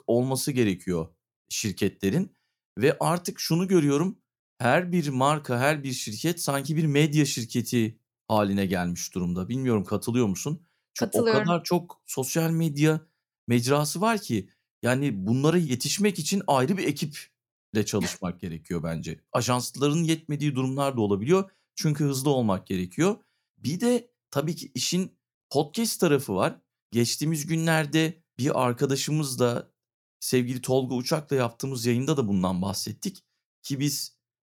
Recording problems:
none

